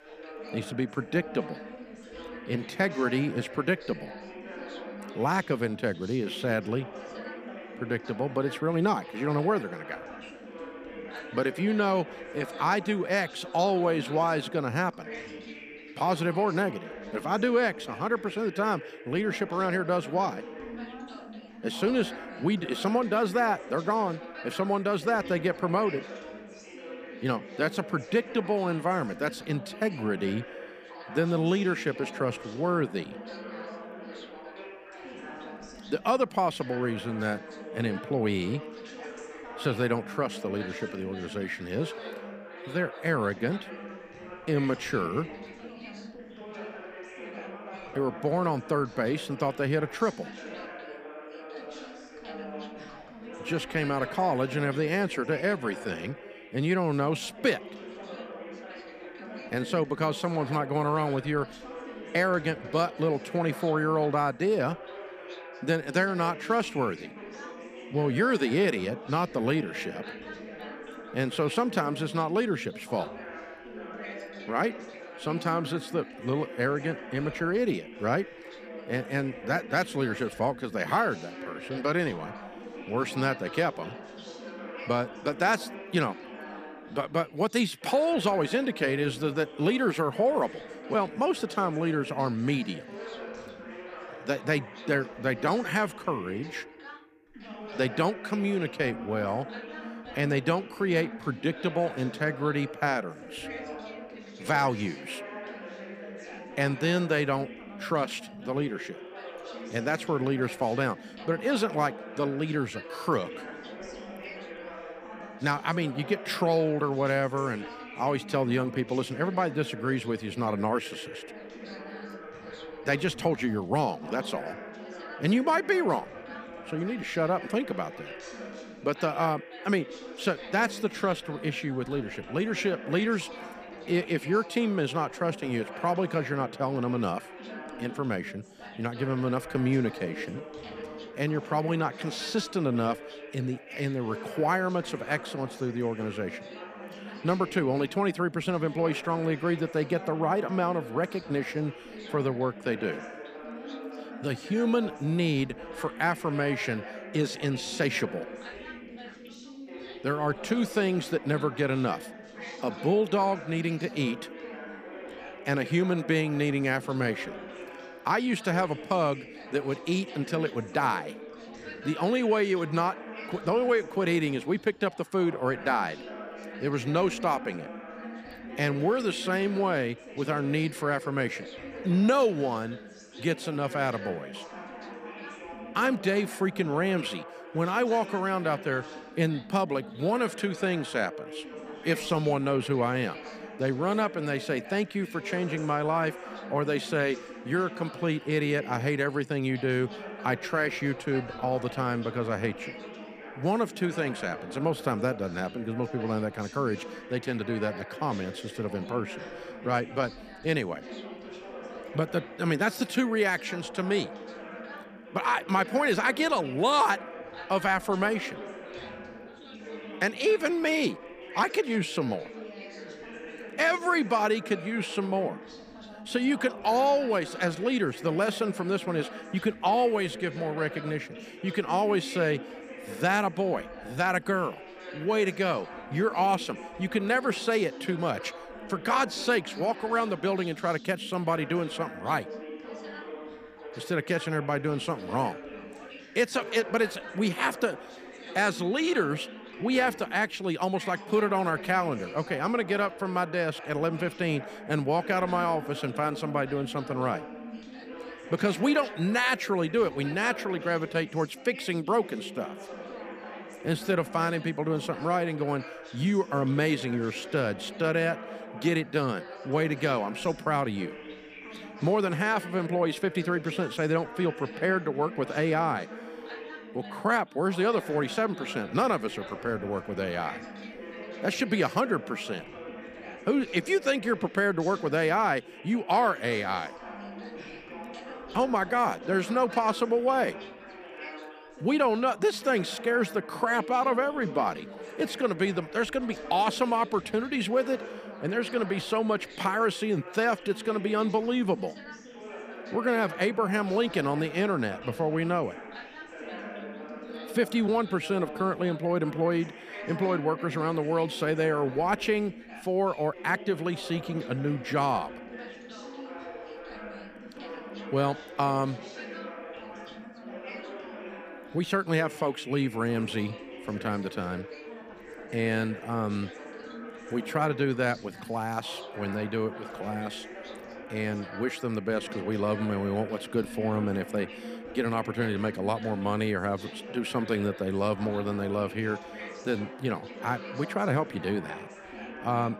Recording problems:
background chatter; noticeable; throughout; 3 voices, 15 dB below the speech

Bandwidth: 15 kHz